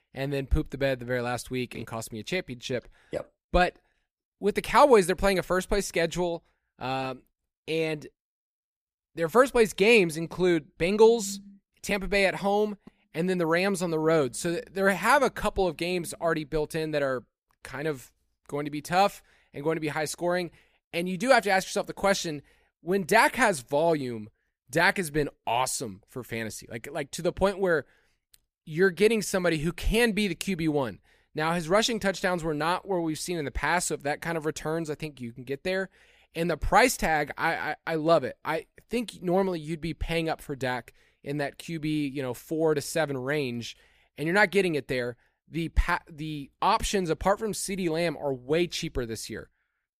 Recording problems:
none

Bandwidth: 15 kHz